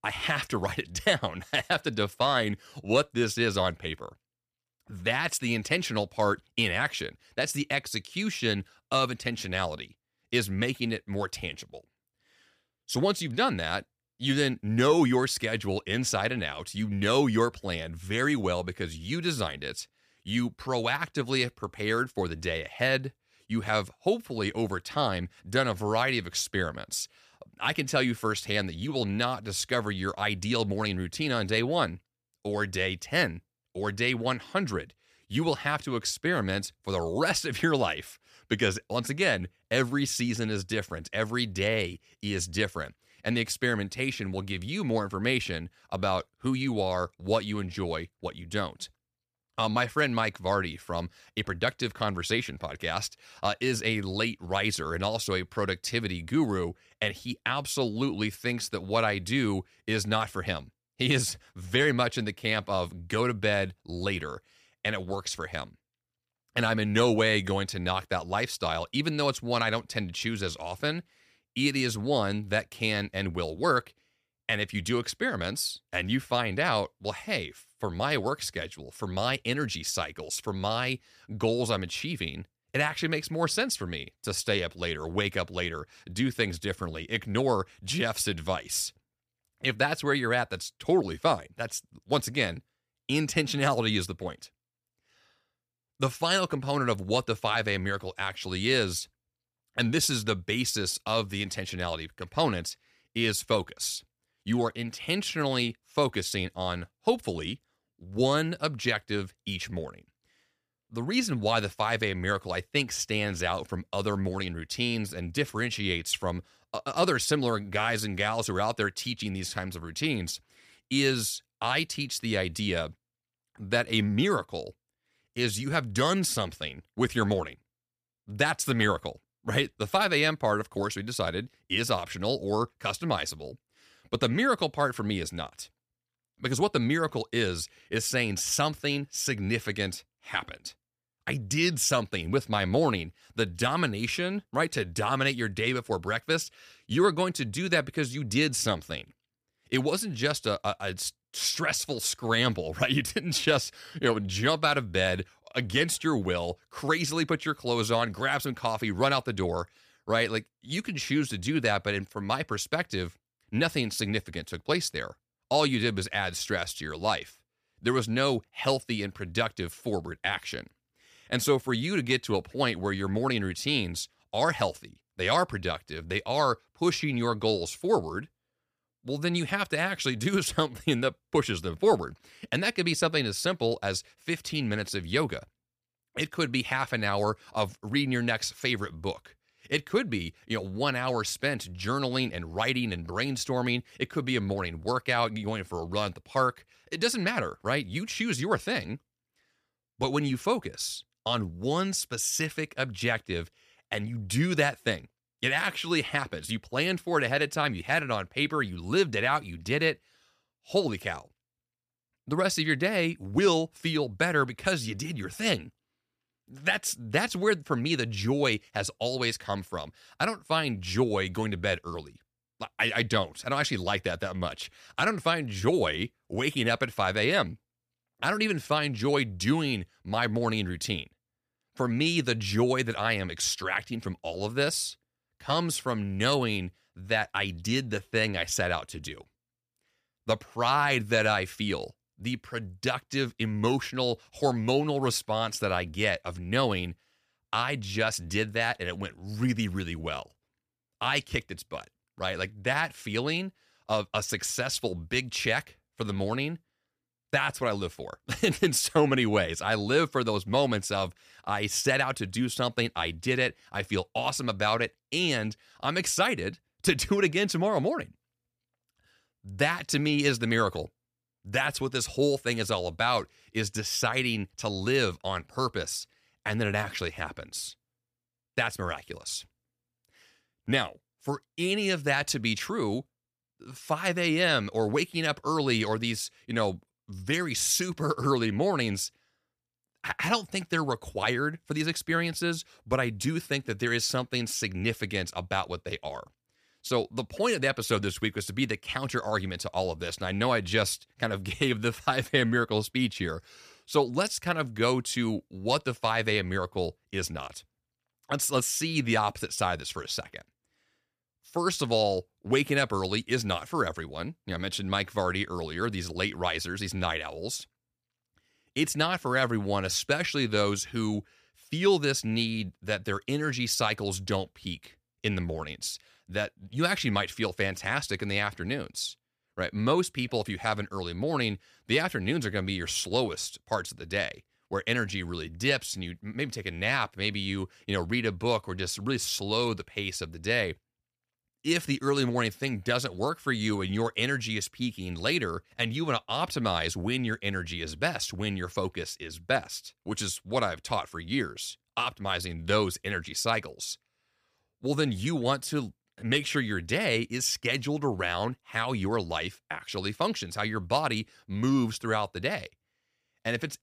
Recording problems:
none

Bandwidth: 15 kHz